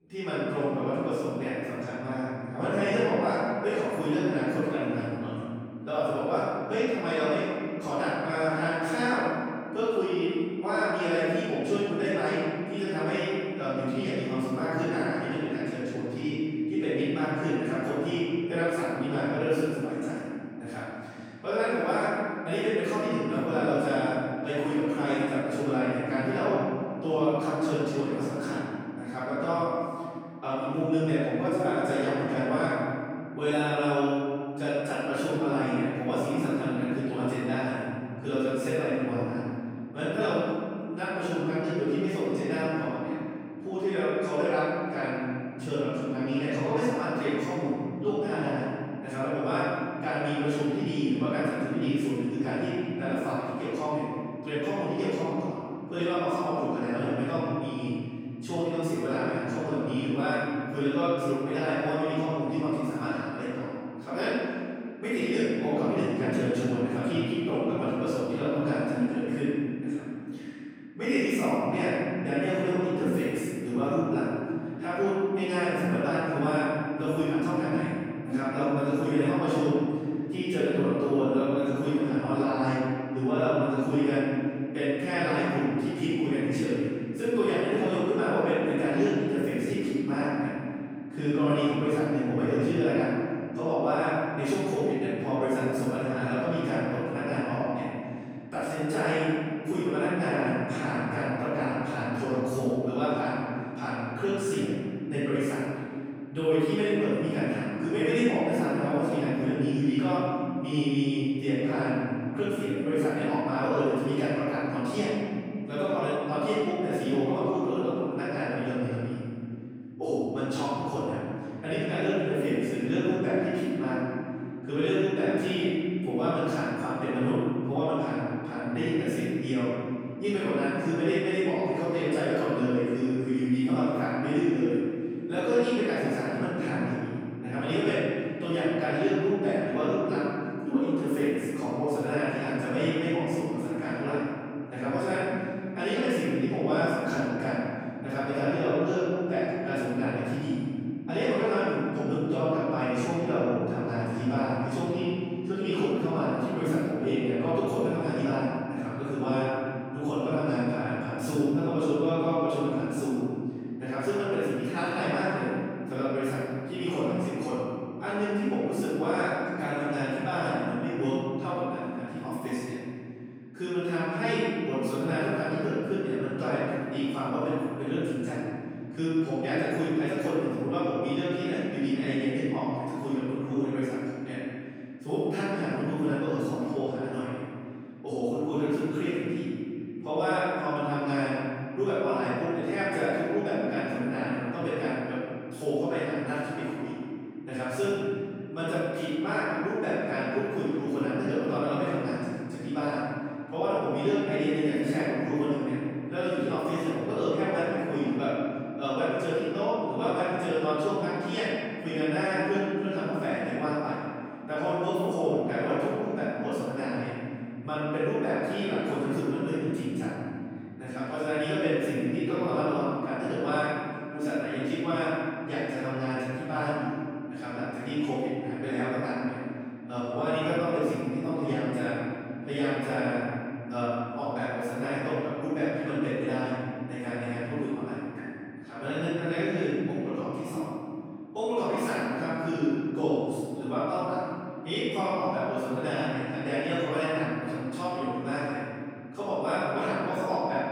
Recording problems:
room echo; strong; dies away in 2.8 s
off-mic speech; far

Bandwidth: 18.5 kHz